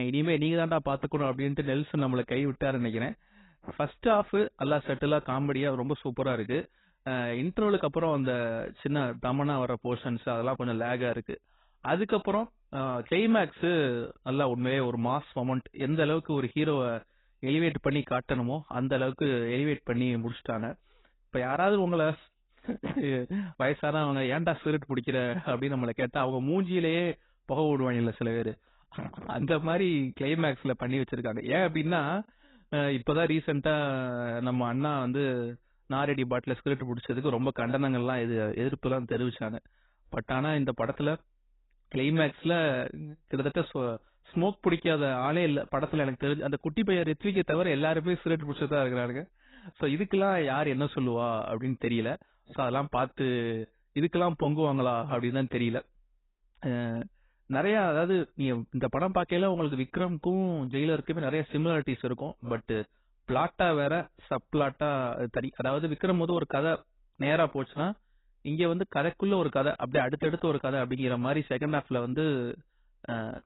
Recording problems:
garbled, watery; badly; nothing above 4 kHz
abrupt cut into speech; at the start

